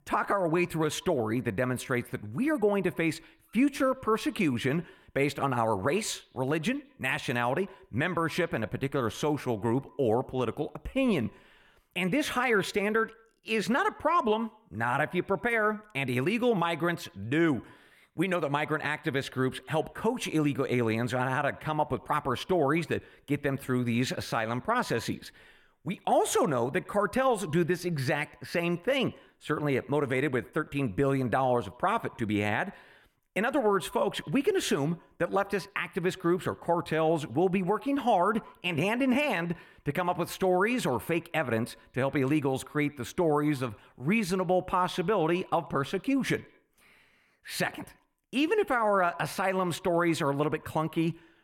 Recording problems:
echo of what is said; faint; throughout; 100 ms later, 25 dB below the speech

